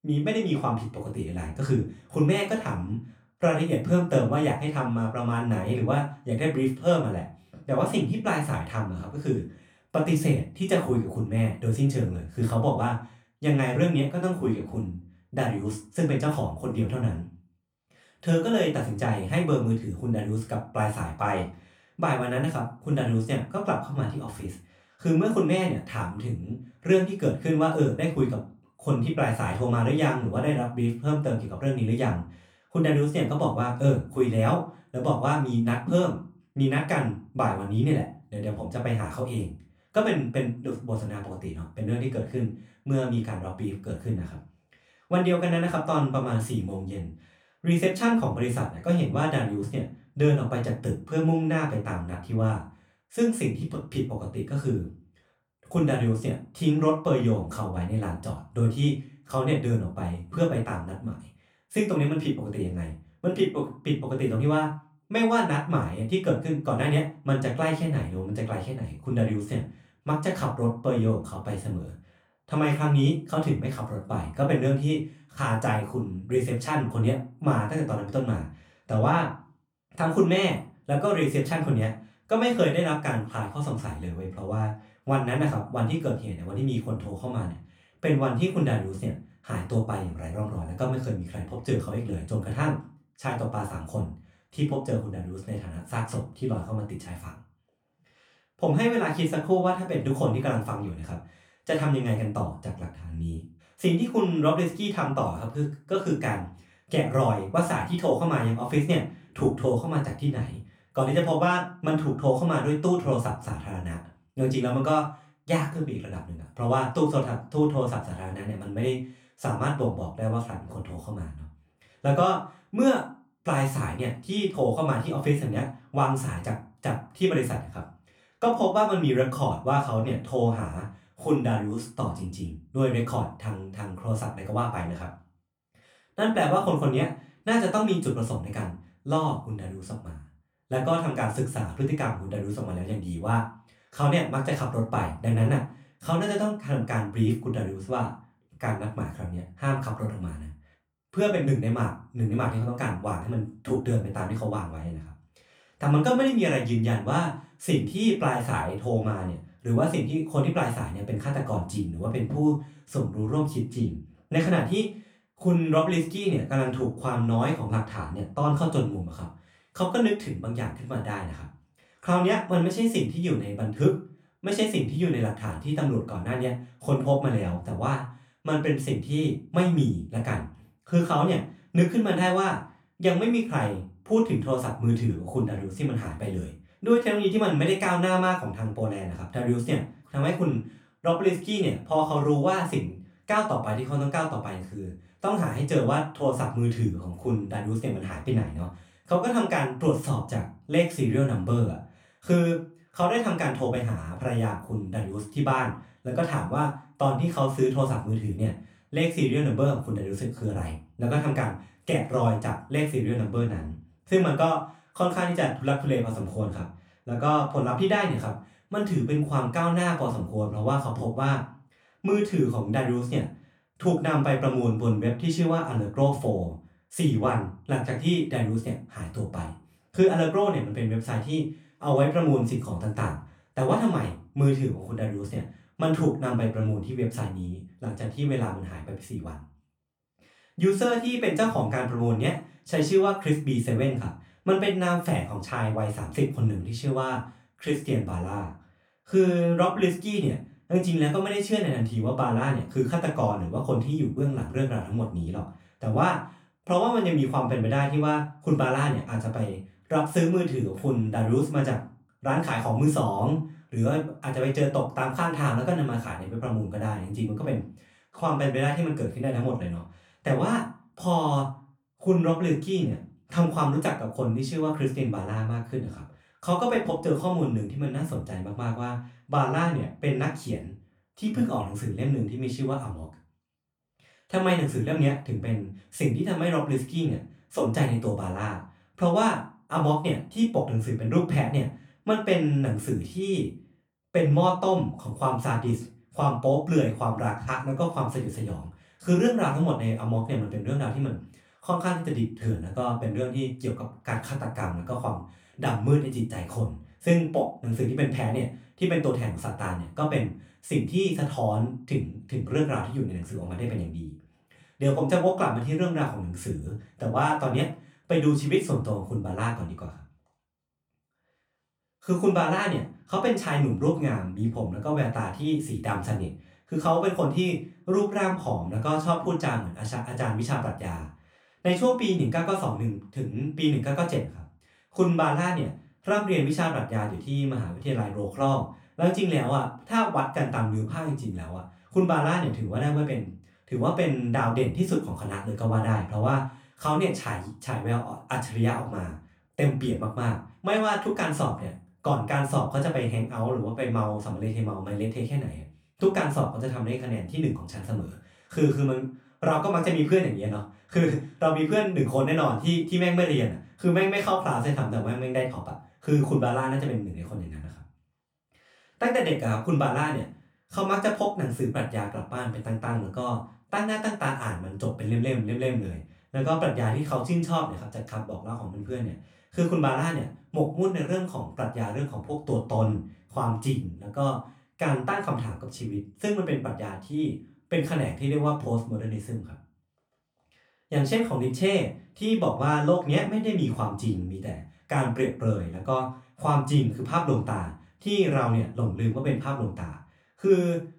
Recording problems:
off-mic speech; far
room echo; slight; dies away in 0.3 s

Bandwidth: 18.5 kHz